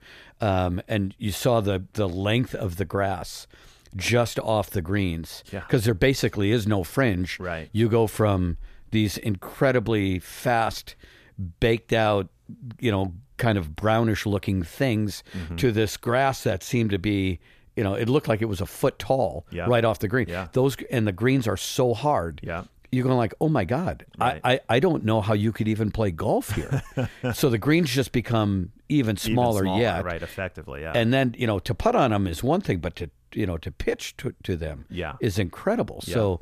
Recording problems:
none

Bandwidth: 14.5 kHz